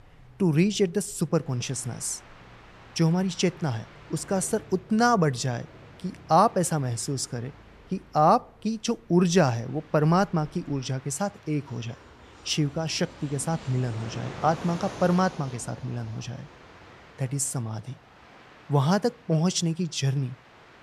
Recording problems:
train or aircraft noise; faint; throughout; 20 dB below the speech

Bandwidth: 13.5 kHz